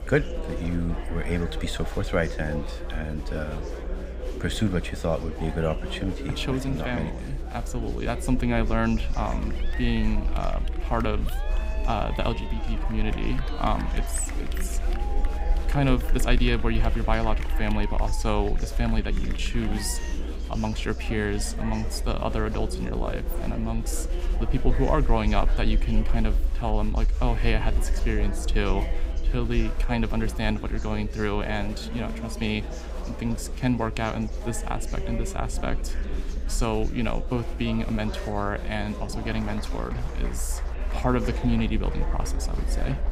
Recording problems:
chatter from many people; loud; throughout; 10 dB below the speech
low rumble; faint; throughout; 25 dB below the speech

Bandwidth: 15.5 kHz